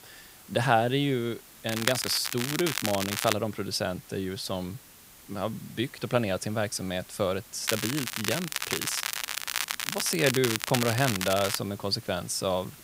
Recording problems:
crackling; loud; from 1.5 to 3.5 s and from 7.5 to 12 s; 2 dB below the speech
hiss; noticeable; throughout; 20 dB below the speech

